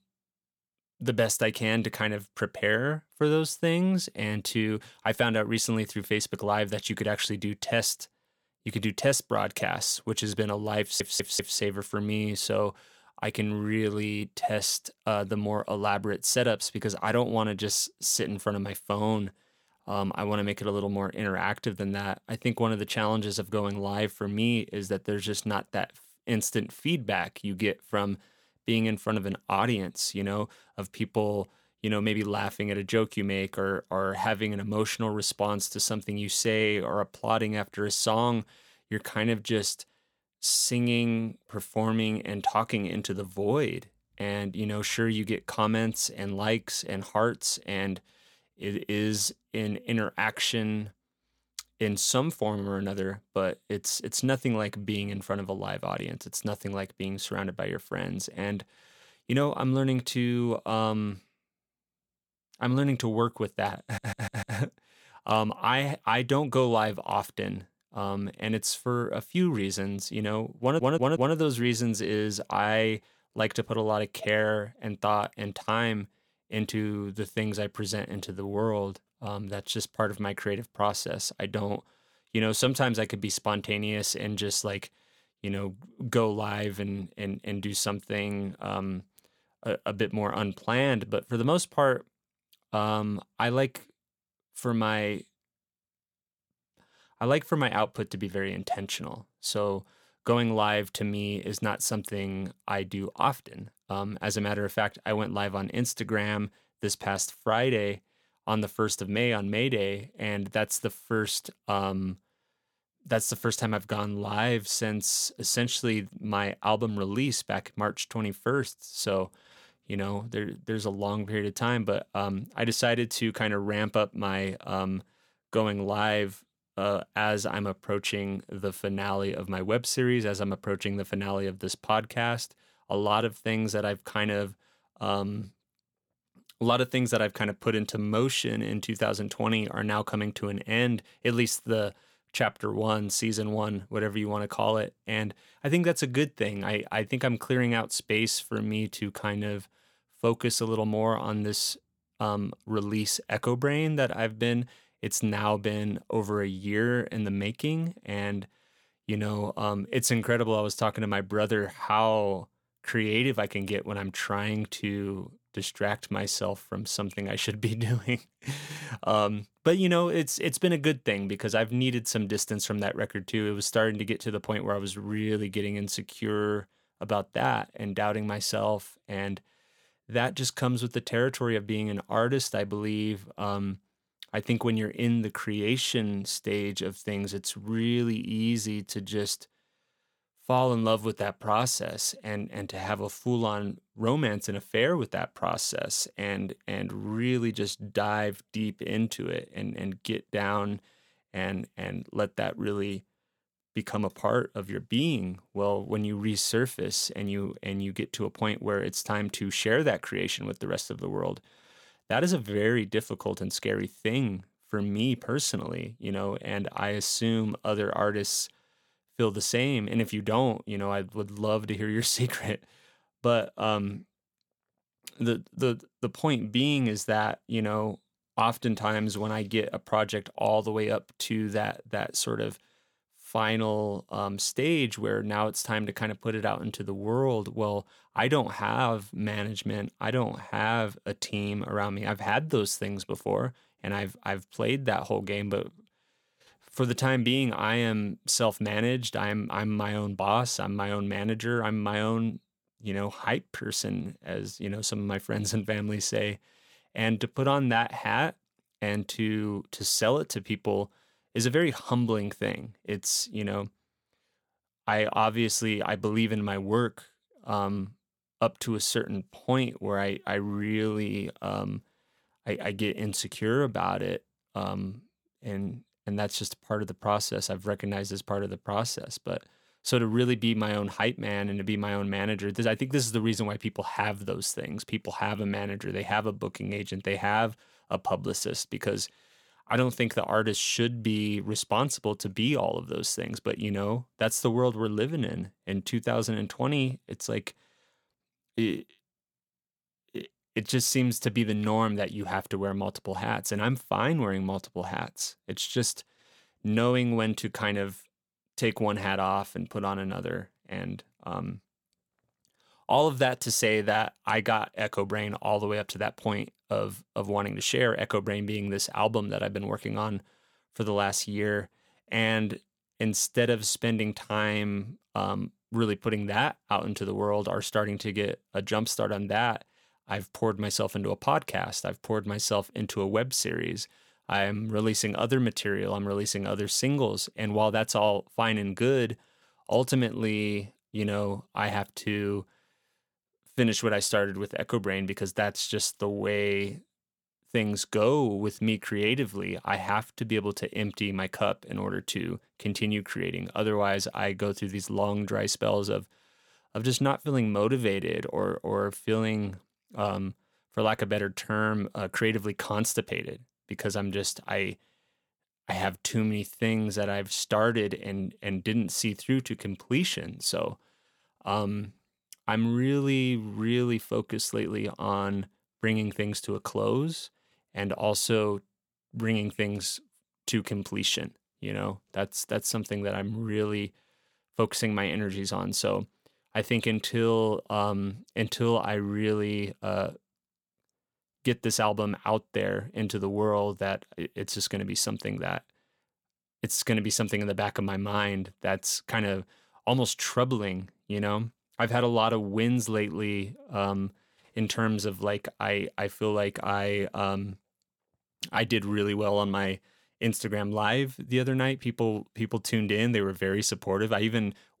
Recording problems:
audio stuttering; at 11 s, at 1:04 and at 1:11

